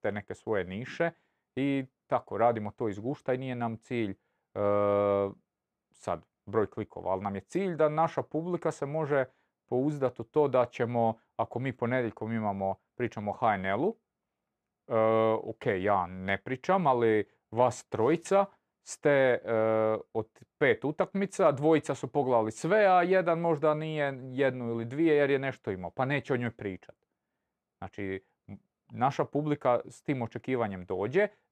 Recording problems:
none

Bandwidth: 14 kHz